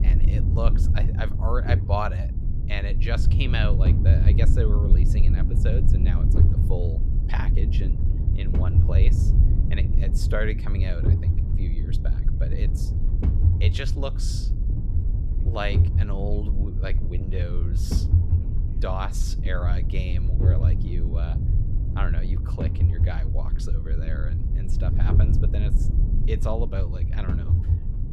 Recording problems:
low rumble; loud; throughout; 4 dB below the speech

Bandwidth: 14.5 kHz